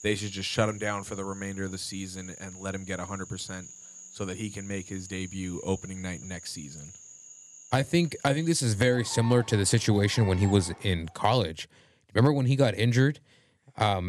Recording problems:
animal sounds; noticeable; until 11 s; 15 dB below the speech
abrupt cut into speech; at the end

